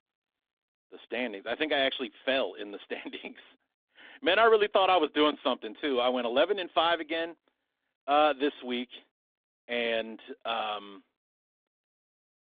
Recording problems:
phone-call audio; nothing above 3.5 kHz

